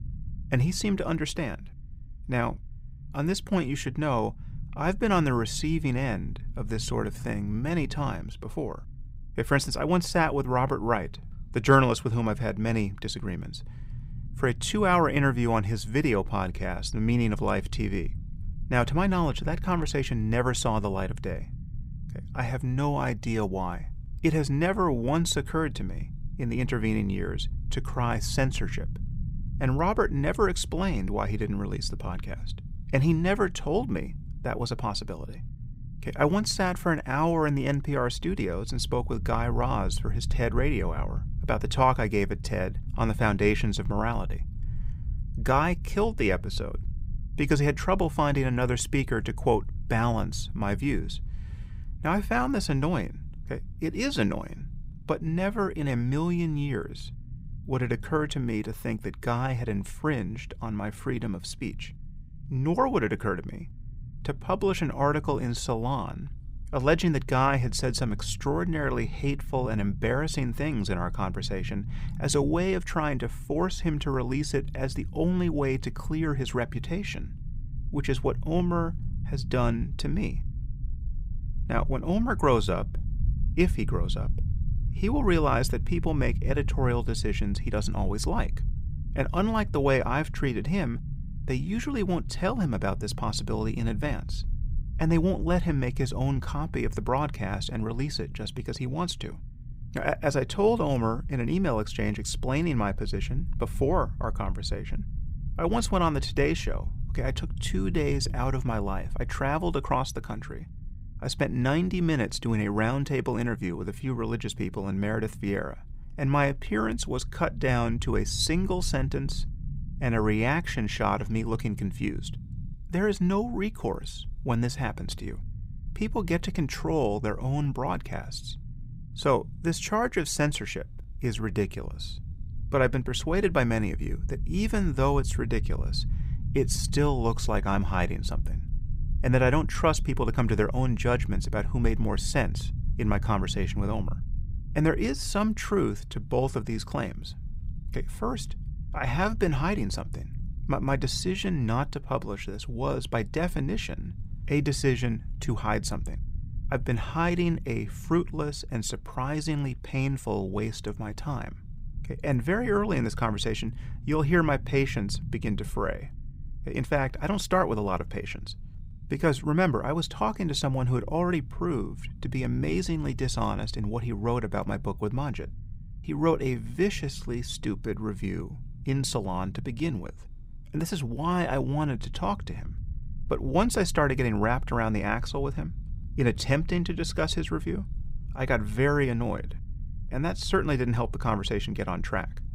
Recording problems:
low rumble; faint; throughout; 25 dB below the speech

